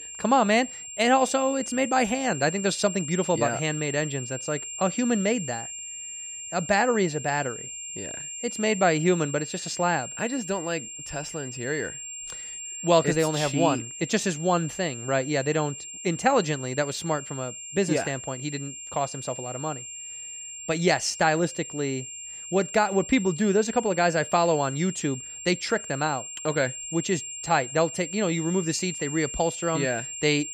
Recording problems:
high-pitched whine; loud; throughout; 7.5 kHz, 9 dB below the speech

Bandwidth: 15.5 kHz